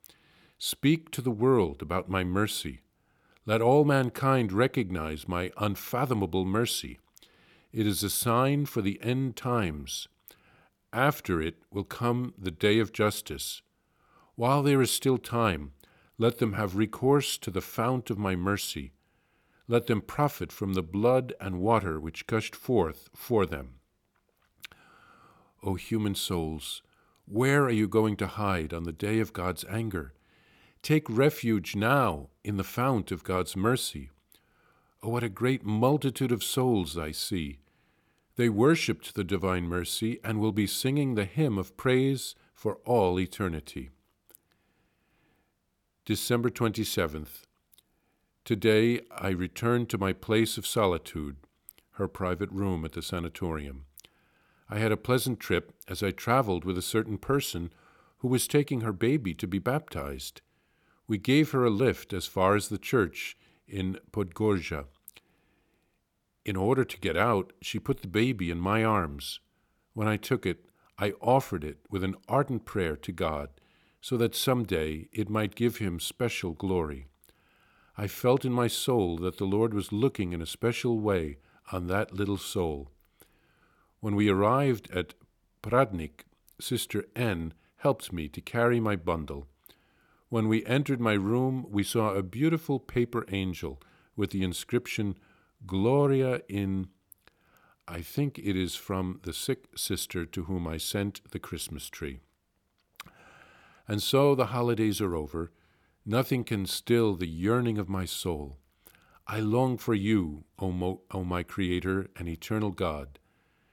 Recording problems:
none

